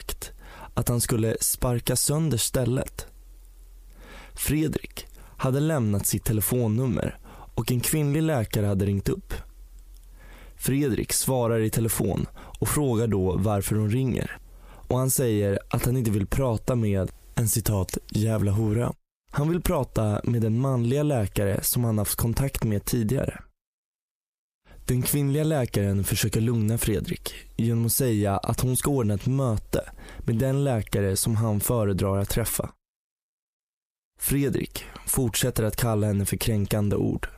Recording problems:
squashed, flat; heavily

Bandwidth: 15 kHz